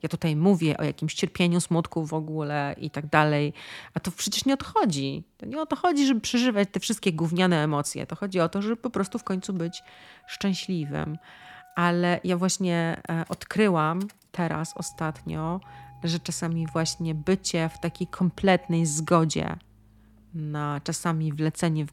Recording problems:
traffic noise; faint; throughout; 25 dB below the speech

